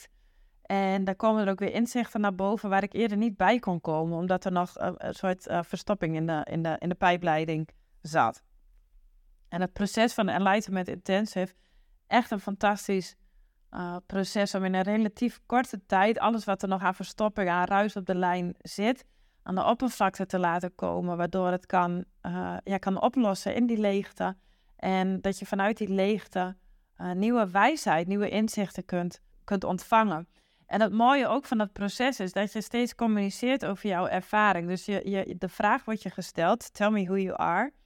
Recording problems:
none

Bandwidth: 17.5 kHz